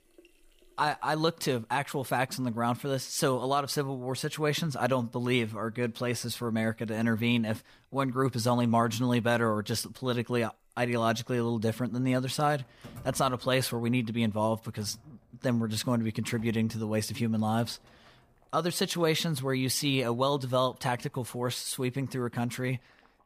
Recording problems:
household noises; faint; throughout; 30 dB below the speech

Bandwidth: 15 kHz